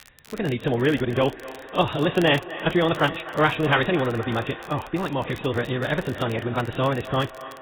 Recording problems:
garbled, watery; badly; nothing above 4 kHz
wrong speed, natural pitch; too fast; 1.7 times normal speed
echo of what is said; noticeable; throughout; 250 ms later, 15 dB below the speech
crackle, like an old record; faint; 25 dB below the speech

